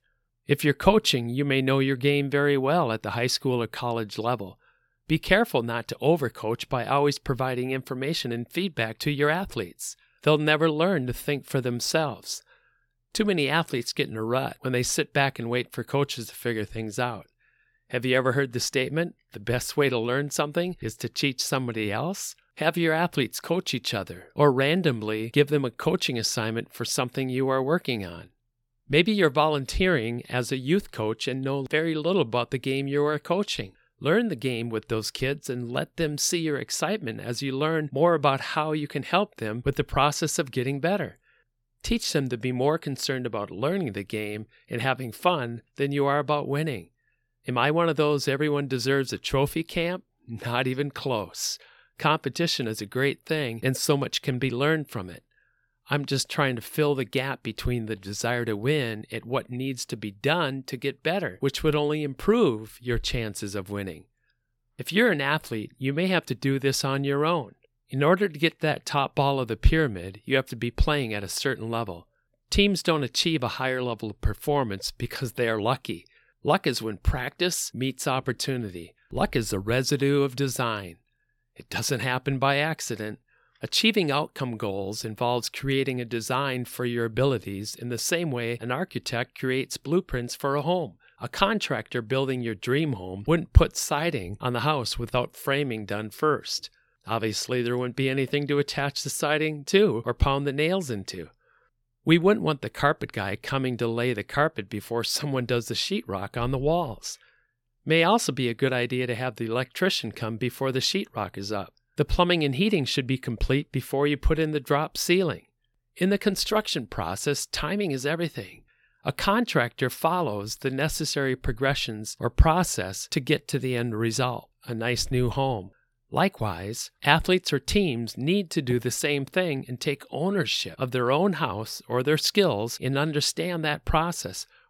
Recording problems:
none

